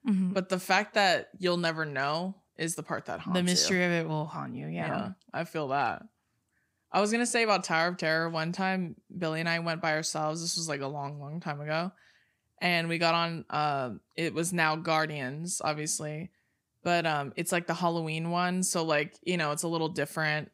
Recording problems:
none

